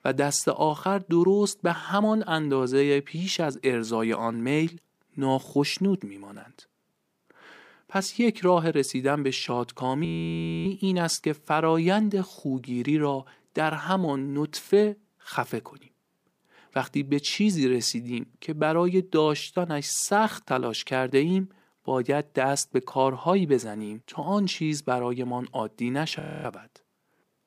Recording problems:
audio freezing; at 10 s for 0.5 s and at 26 s

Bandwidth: 15 kHz